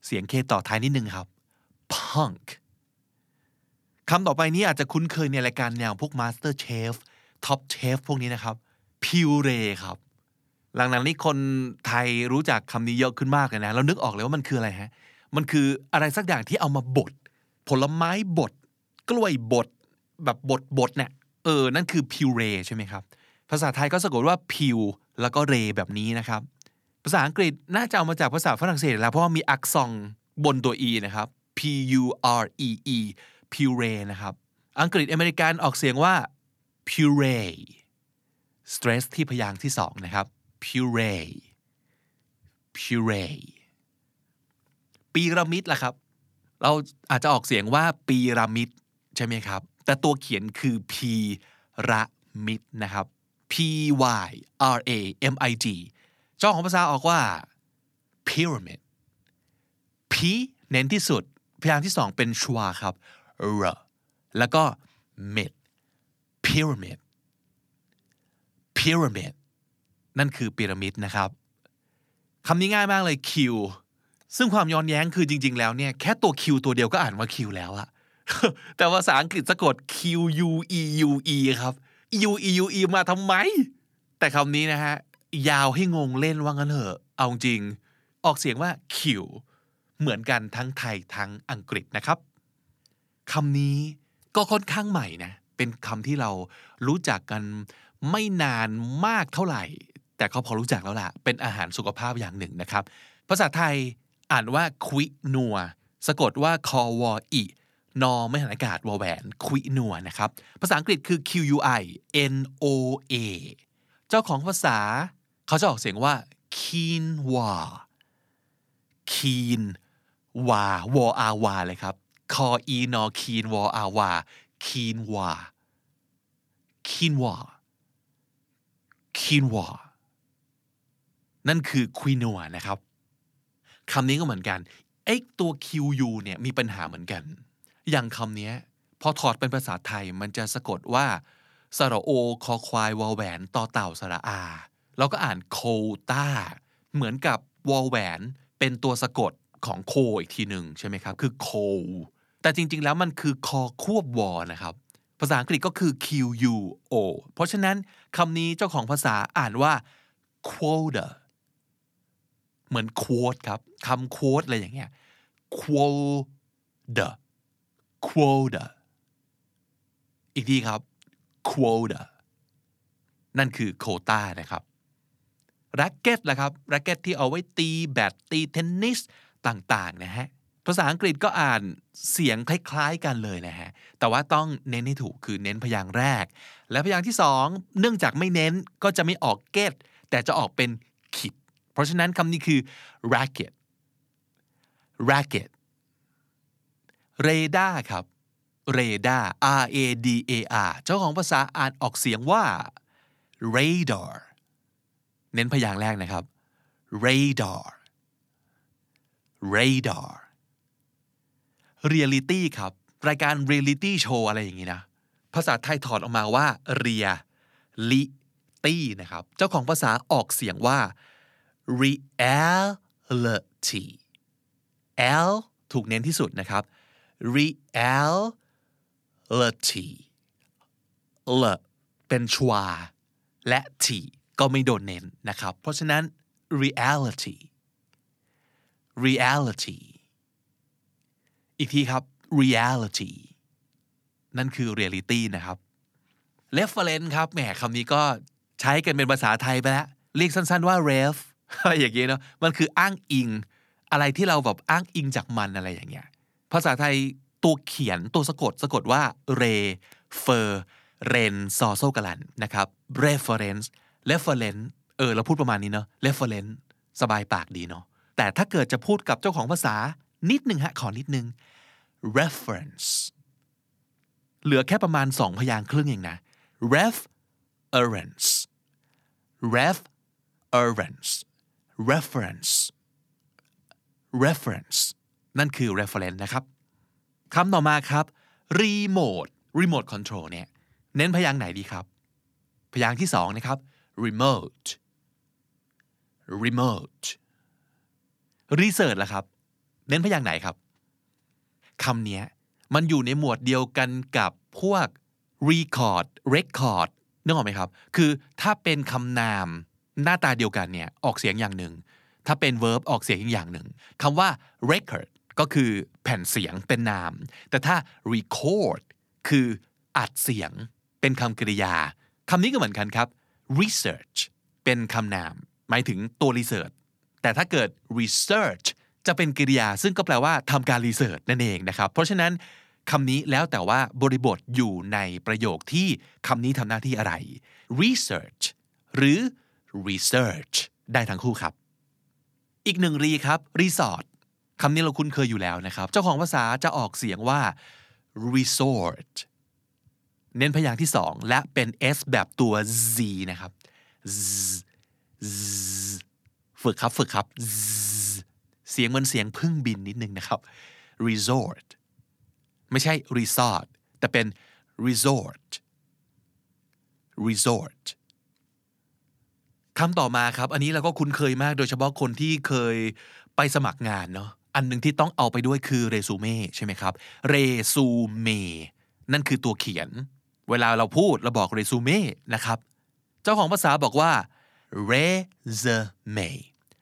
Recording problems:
none

